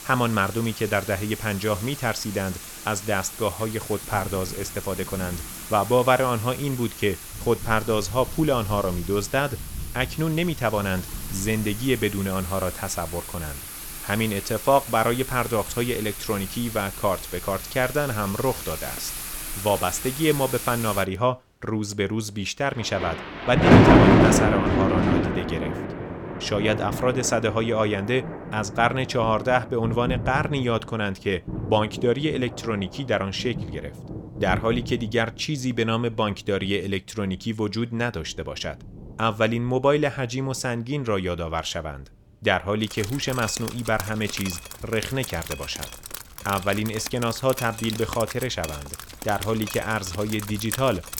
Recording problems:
rain or running water; loud; throughout; 3 dB below the speech

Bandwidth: 17.5 kHz